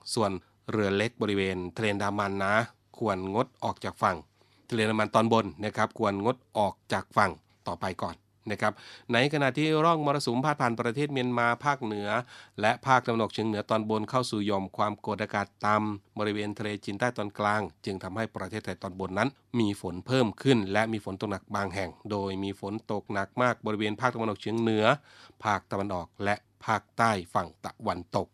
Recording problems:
none

